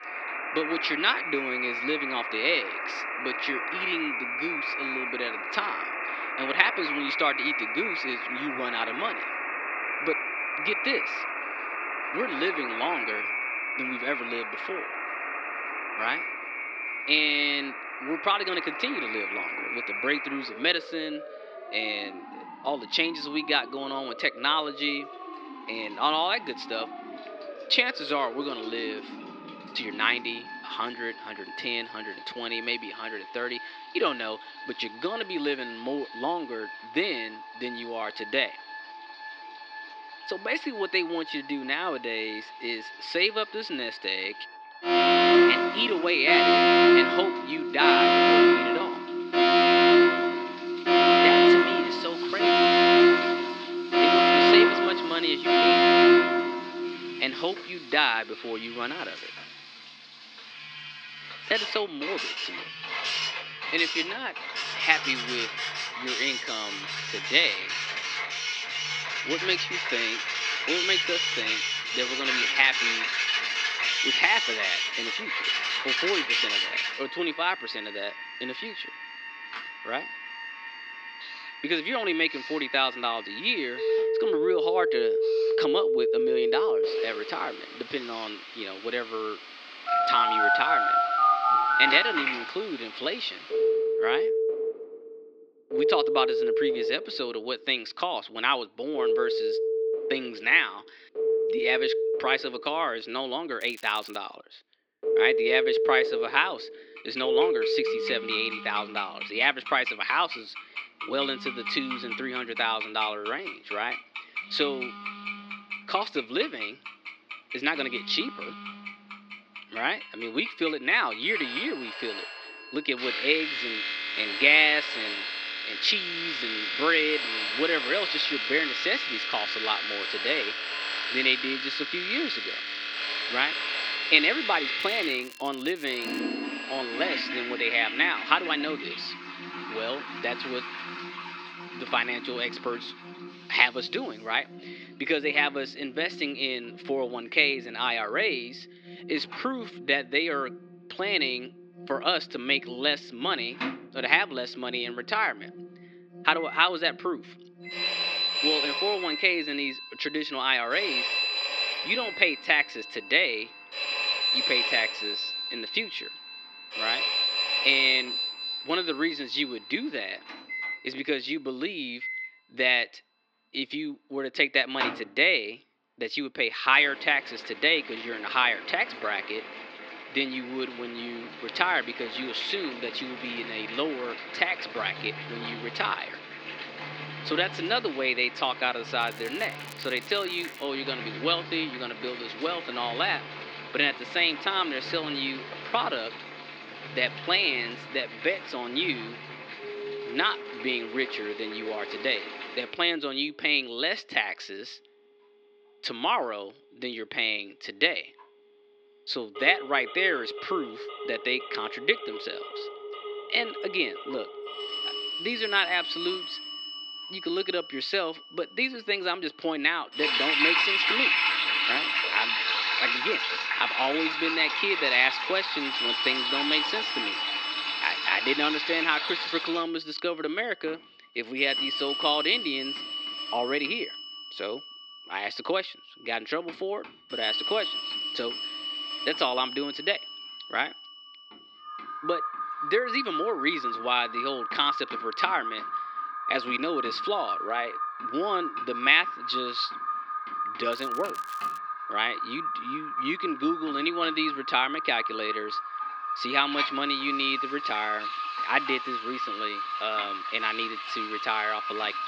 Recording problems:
thin; somewhat; fading below 300 Hz
muffled; very slightly; fading above 4.5 kHz
alarms or sirens; very loud; throughout; as loud as the speech
household noises; loud; throughout; 4 dB below the speech
crackling; faint; 4 times, first at 1:44; 20 dB below the speech

